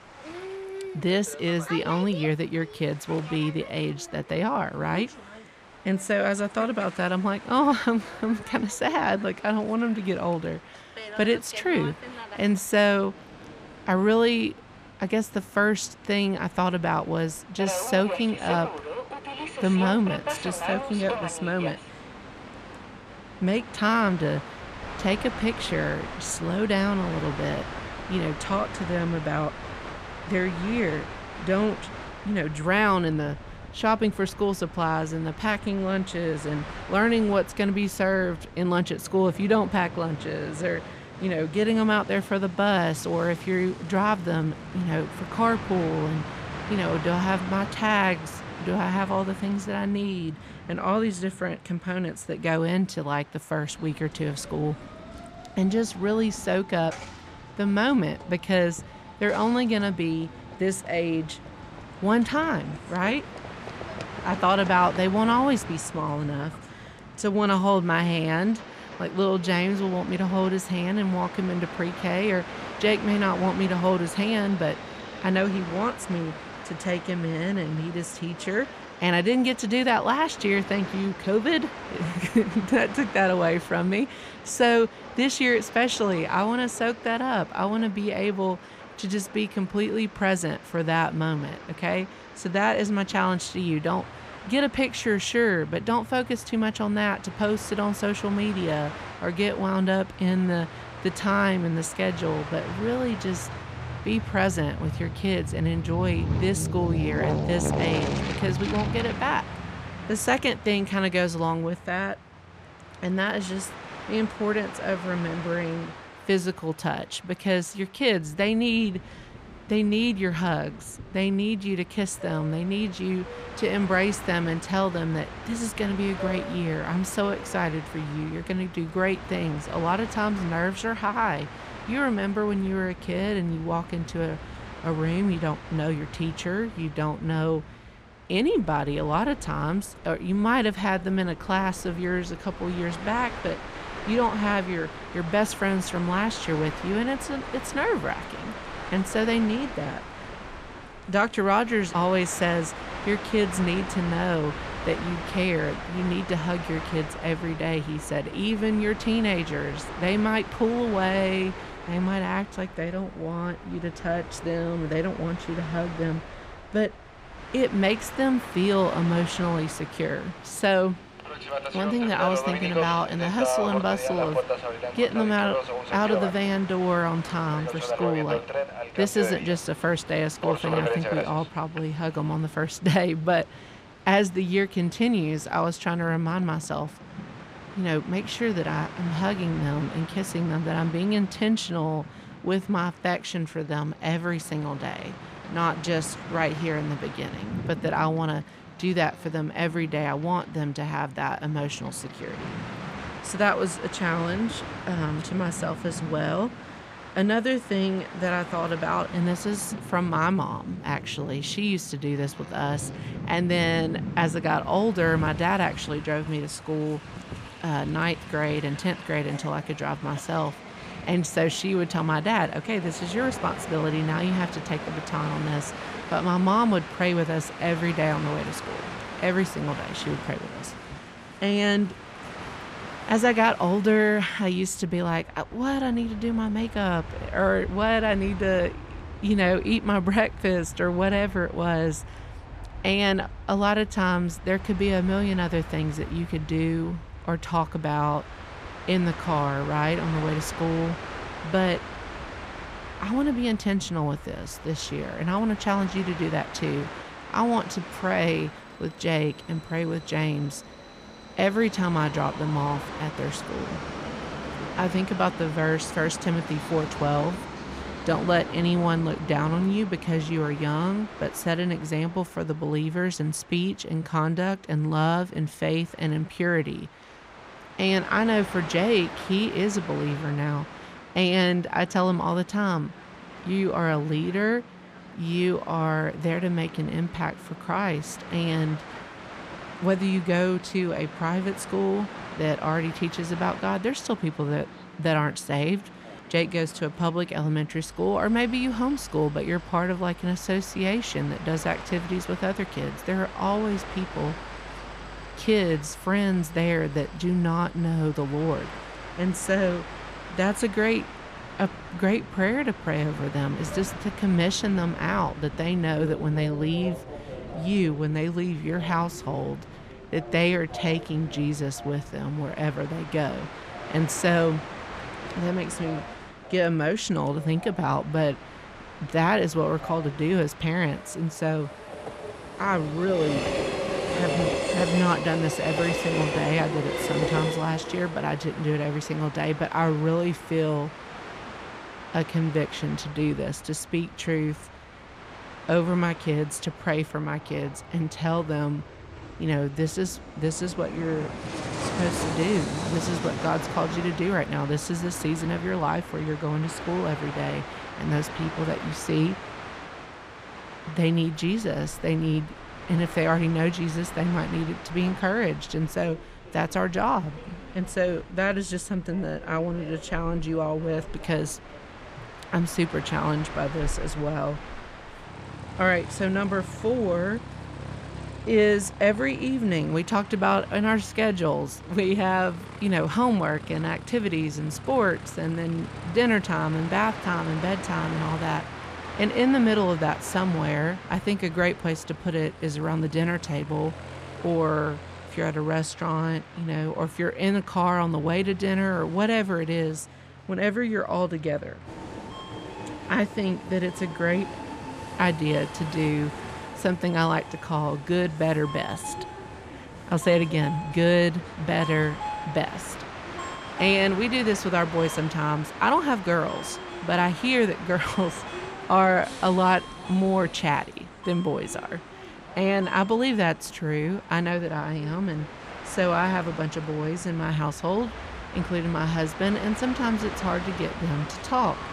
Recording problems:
train or aircraft noise; noticeable; throughout; 10 dB below the speech

